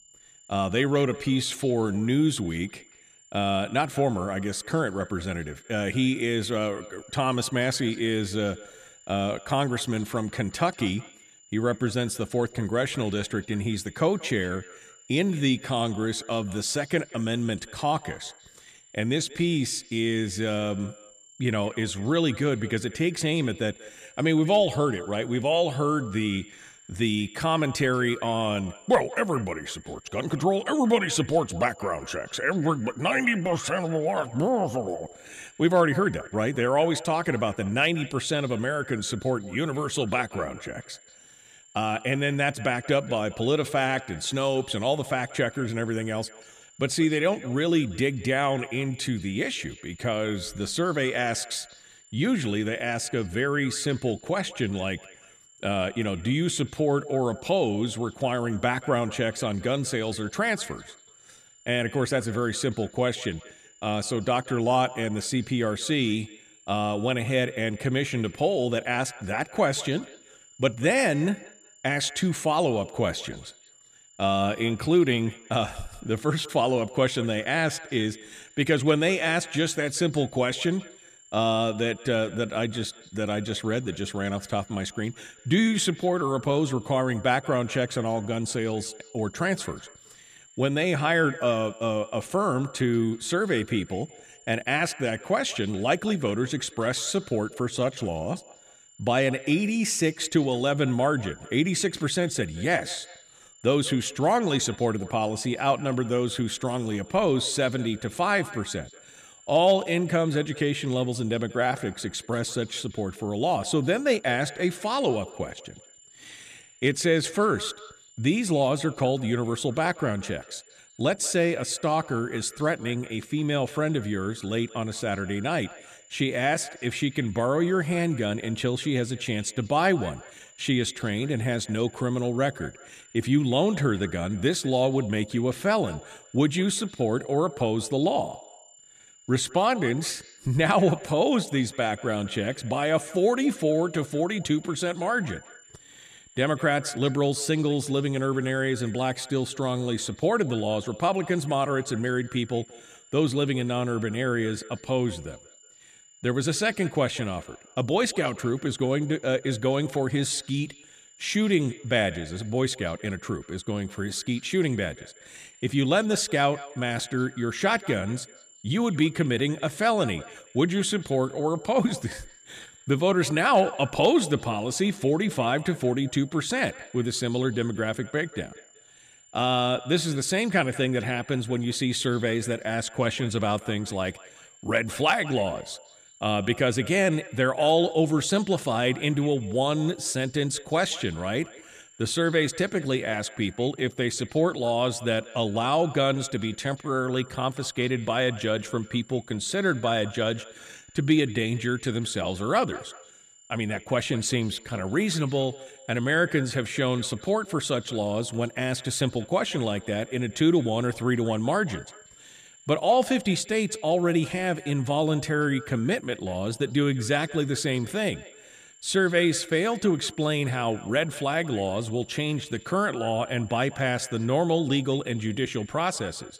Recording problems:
echo of what is said; faint; throughout; 190 ms later, 20 dB below the speech
high-pitched whine; faint; throughout; 7 kHz, 25 dB below the speech

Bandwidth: 14.5 kHz